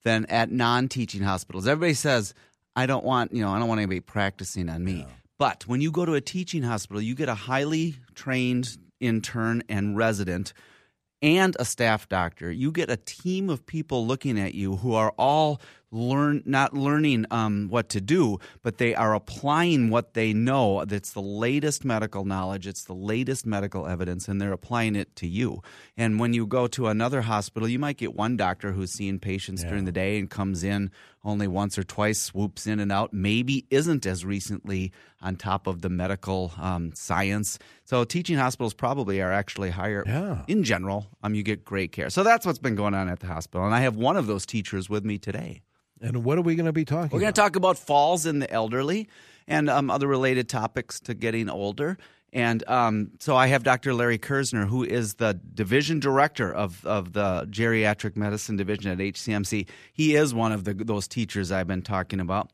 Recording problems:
none

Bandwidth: 14.5 kHz